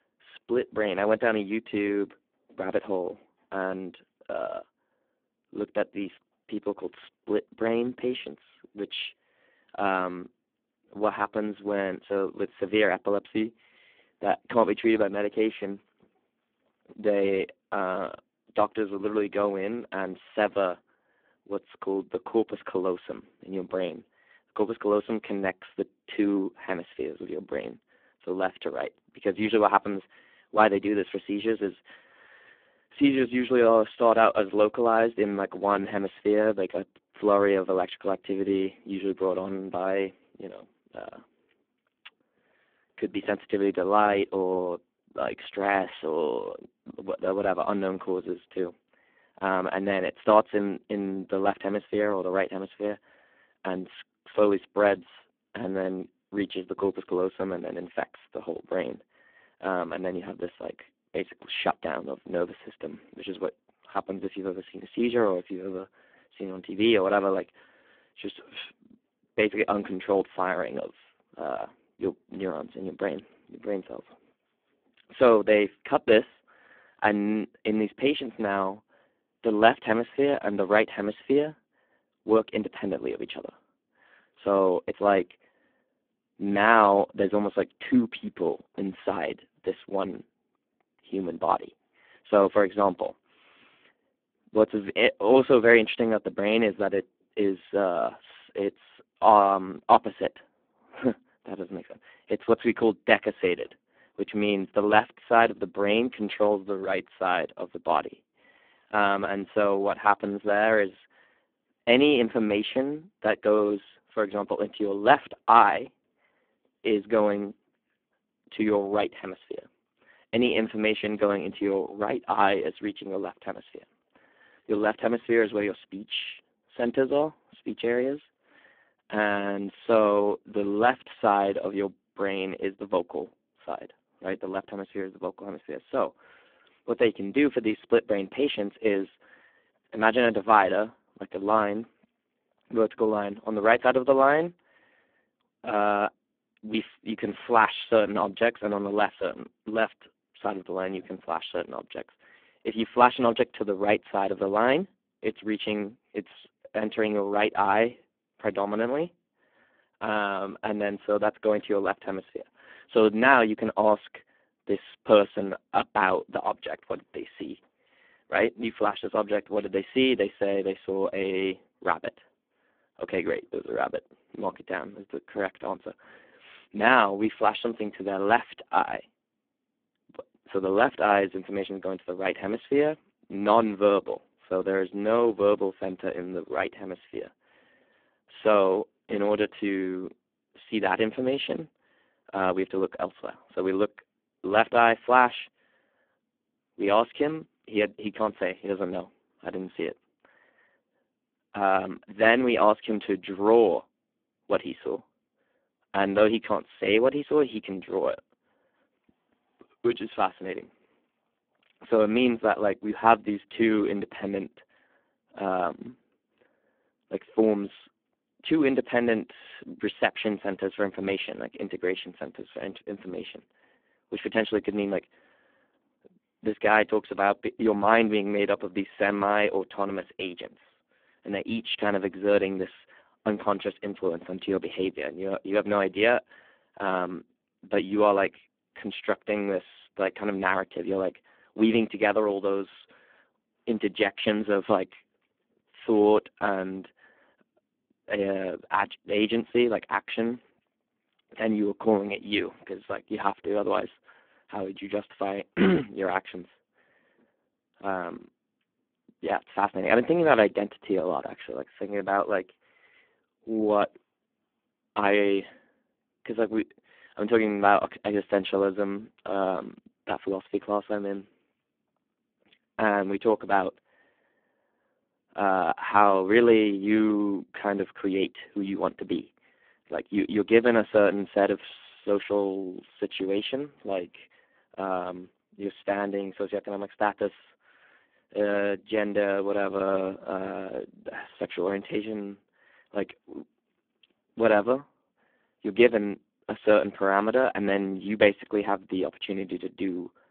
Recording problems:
phone-call audio; poor line

